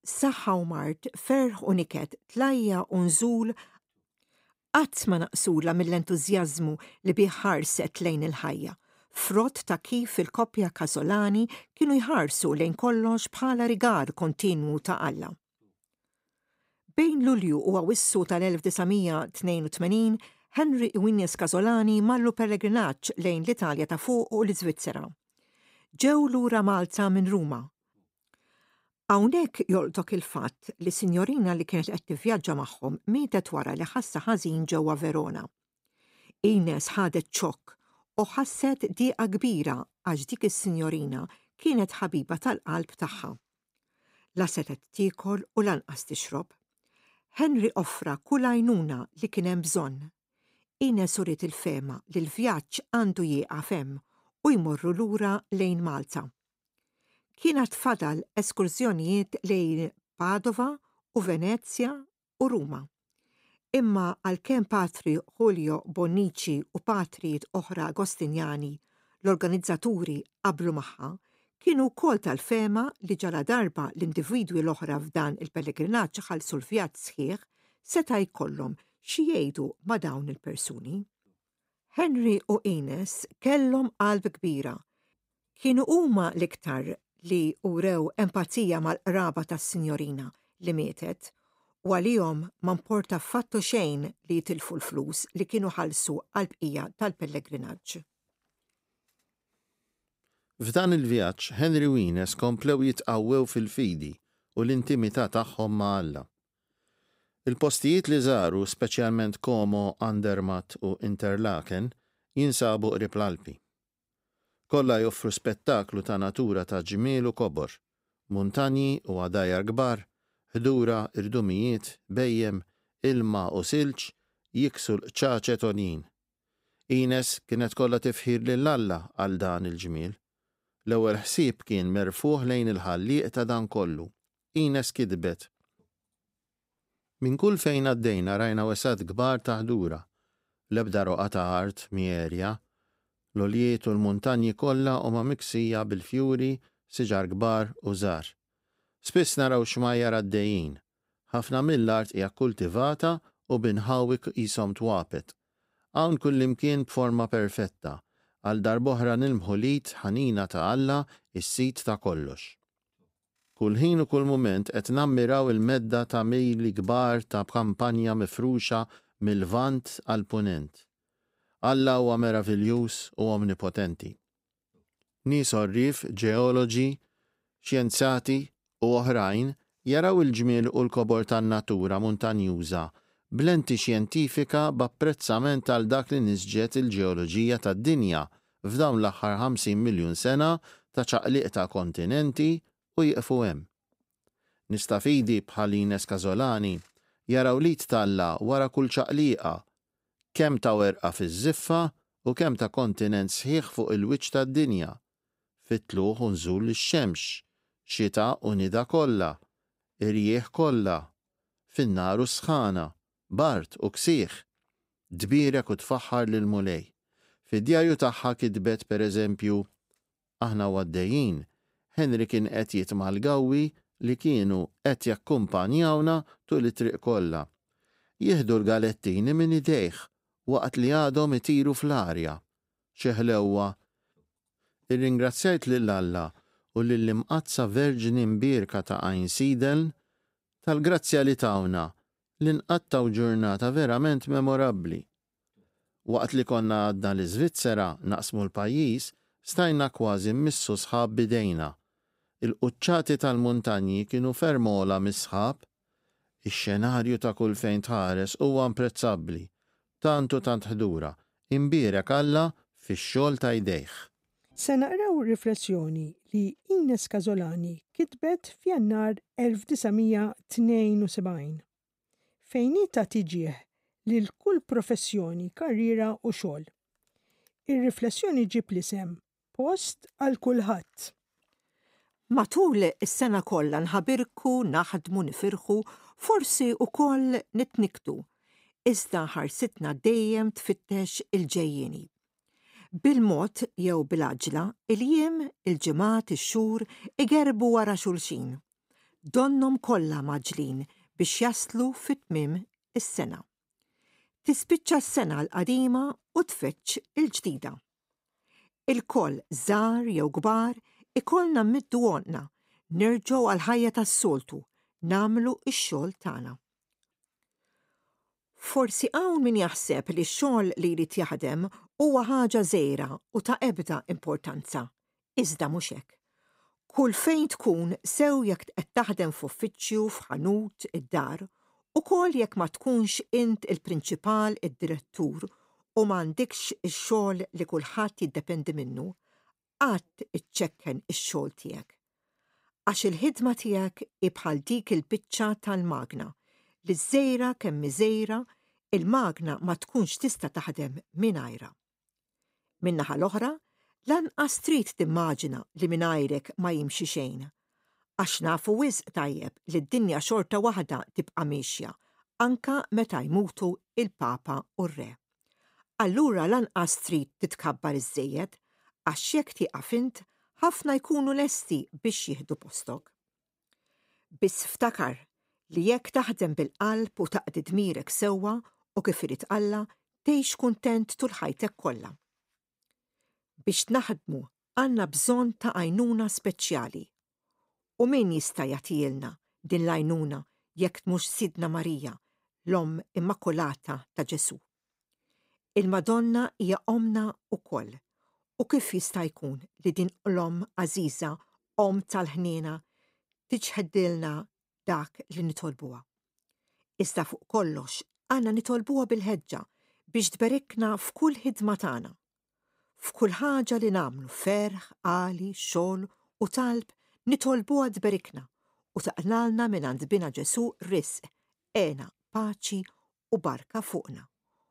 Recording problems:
none

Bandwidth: 15.5 kHz